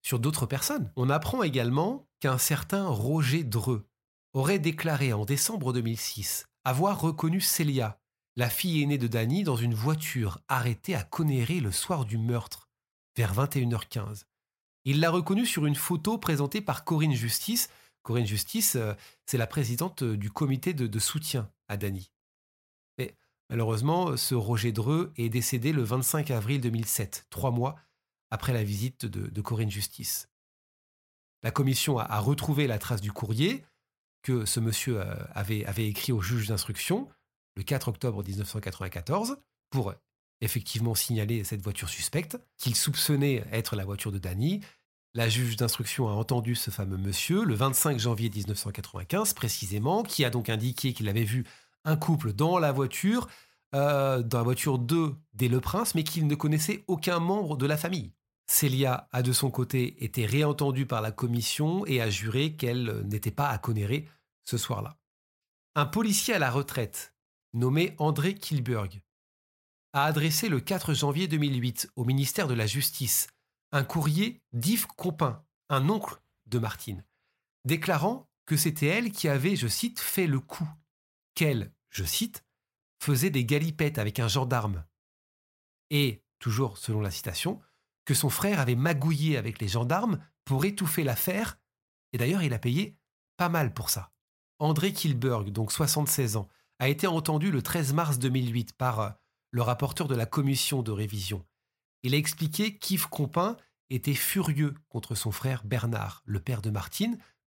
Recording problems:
none

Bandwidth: 16 kHz